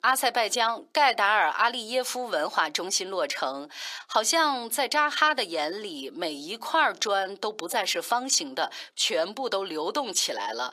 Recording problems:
thin; somewhat; fading below 450 Hz

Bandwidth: 15 kHz